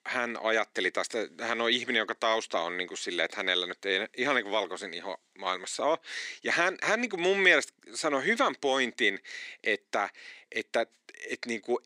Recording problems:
thin; somewhat; fading below 300 Hz

